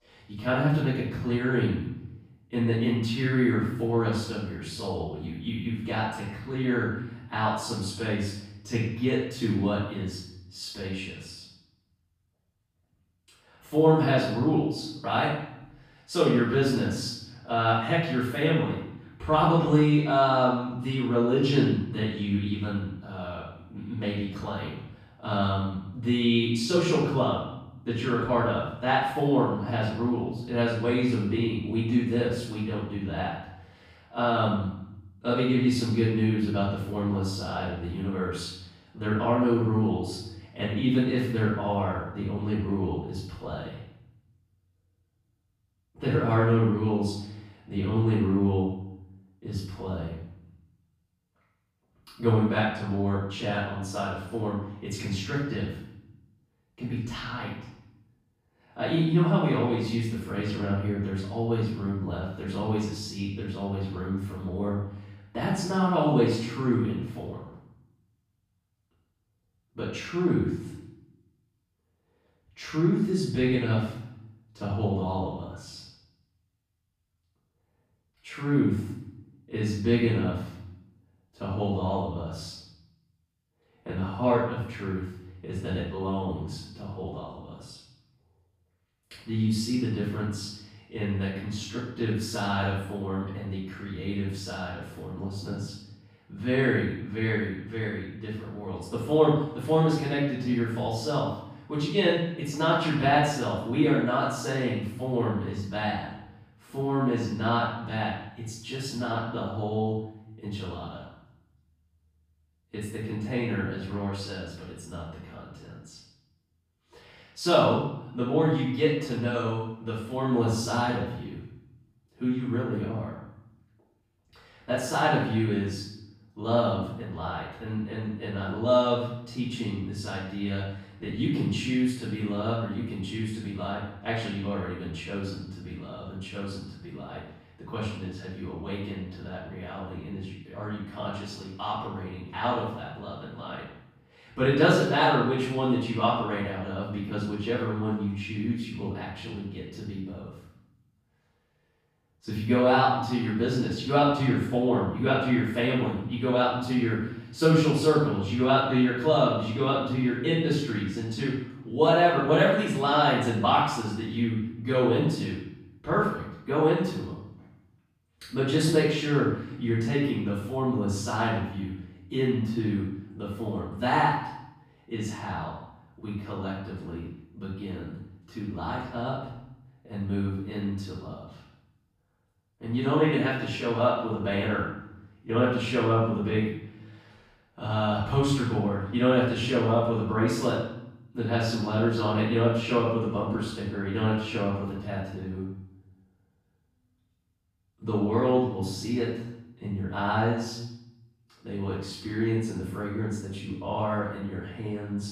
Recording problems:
off-mic speech; far
room echo; noticeable; dies away in 0.7 s

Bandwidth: 15 kHz